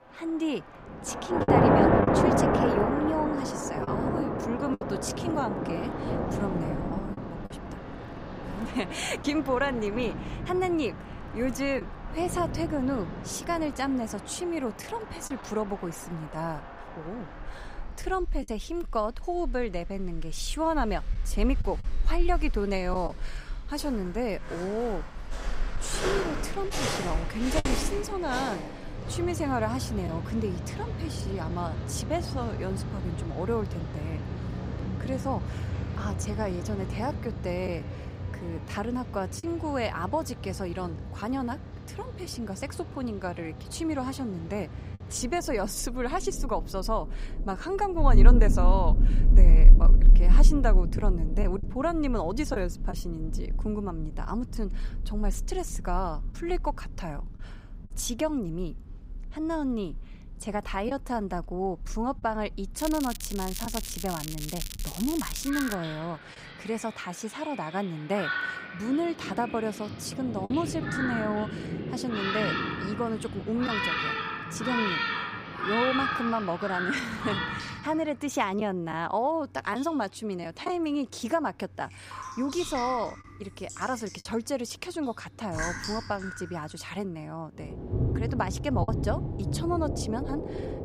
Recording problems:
rain or running water; very loud; throughout; 1 dB above the speech
crackling; loud; from 1:03 to 1:06; 6 dB below the speech
choppy; occasionally; 1% of the speech affected

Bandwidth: 15.5 kHz